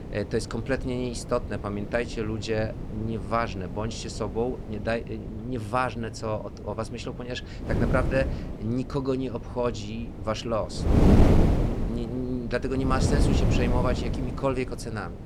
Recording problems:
wind noise on the microphone; heavy; 4 dB below the speech

